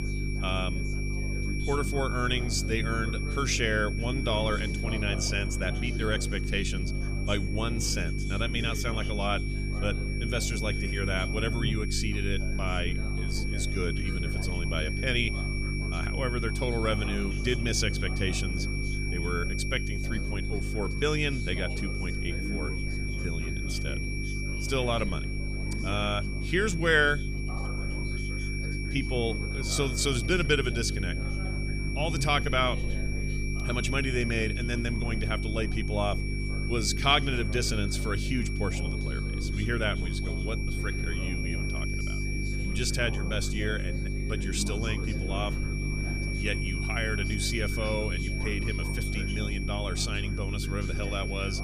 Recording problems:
high-pitched whine; loud; throughout; 2.5 kHz, 7 dB below the speech
electrical hum; noticeable; throughout; 50 Hz, 15 dB below the speech
background chatter; noticeable; throughout; 4 voices, 15 dB below the speech

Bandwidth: 14.5 kHz